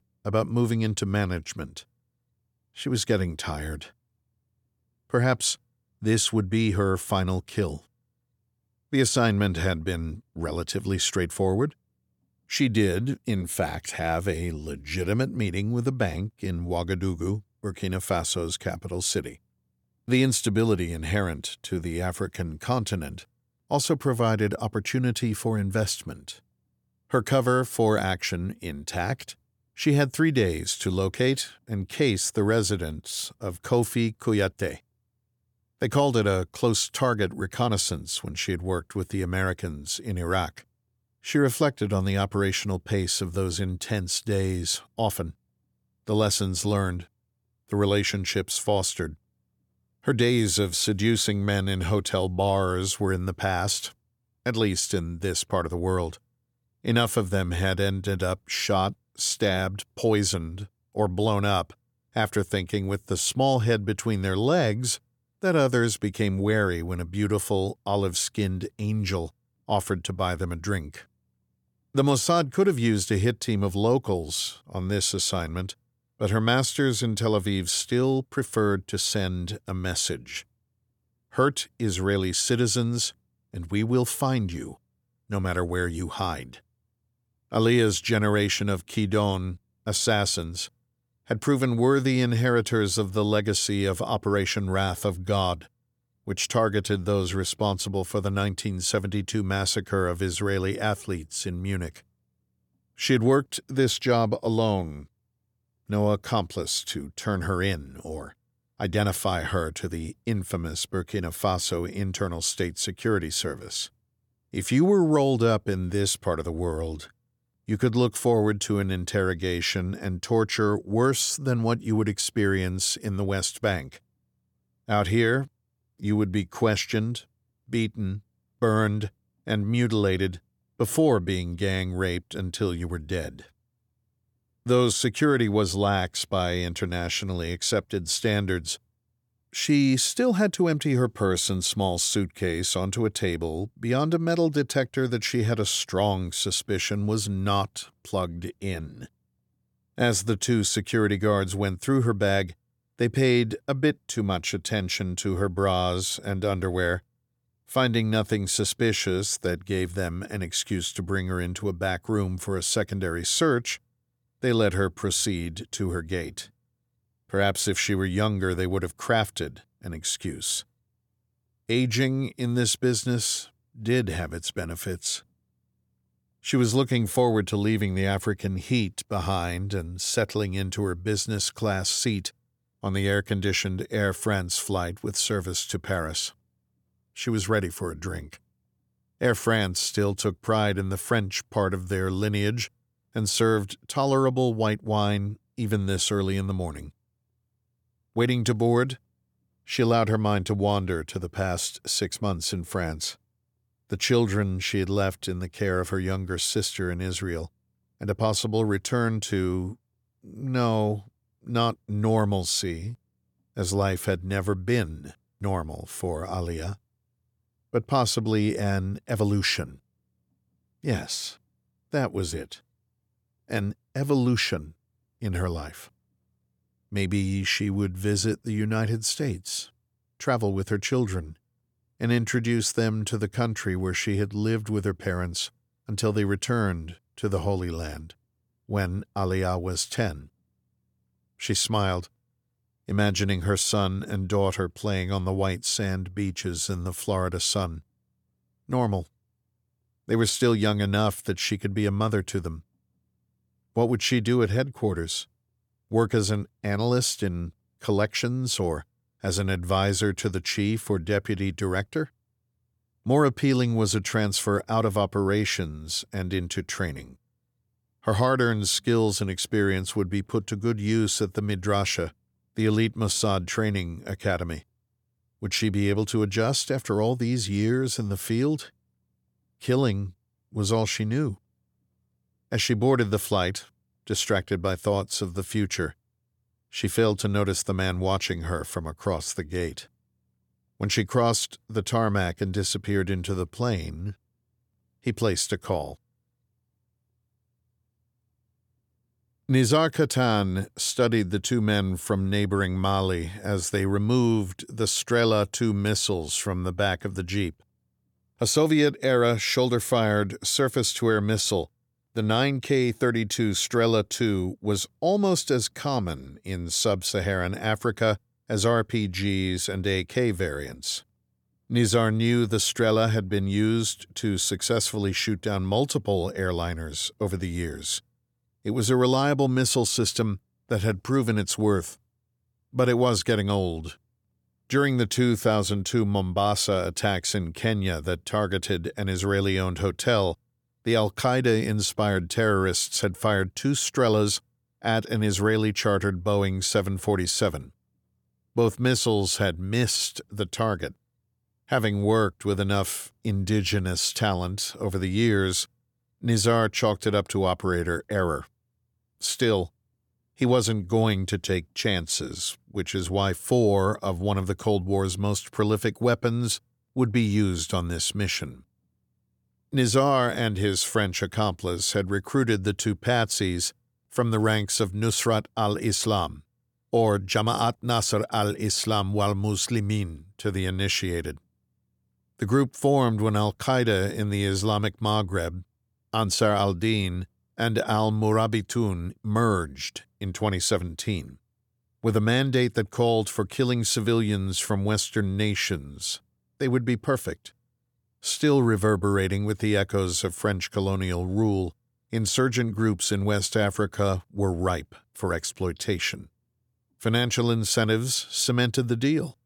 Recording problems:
none

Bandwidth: 18.5 kHz